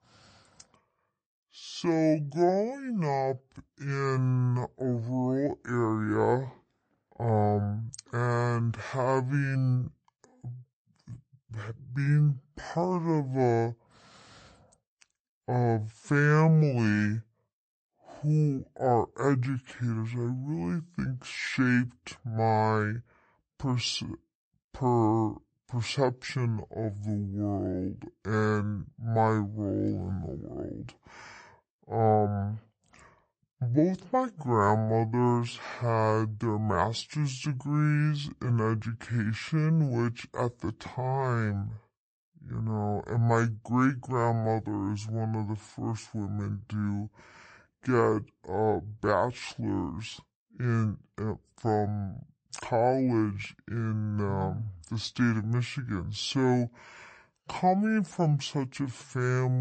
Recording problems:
wrong speed and pitch; too slow and too low; 0.6 times normal speed
abrupt cut into speech; at the end

